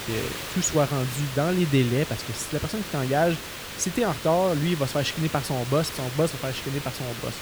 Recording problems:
hiss; loud; throughout; 8 dB below the speech

